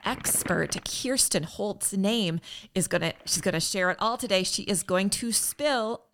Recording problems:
household noises; noticeable; throughout; 20 dB below the speech

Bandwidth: 17.5 kHz